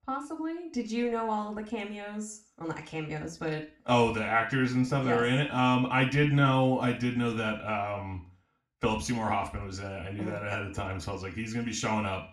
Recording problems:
room echo; slight; dies away in 0.4 s
off-mic speech; somewhat distant

